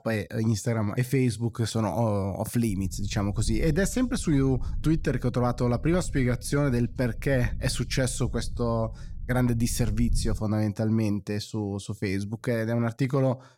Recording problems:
low rumble; faint; from 2.5 to 10 s; 25 dB below the speech

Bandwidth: 16 kHz